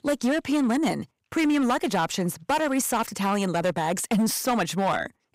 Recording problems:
distortion; slight; 10% of the sound clipped

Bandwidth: 15.5 kHz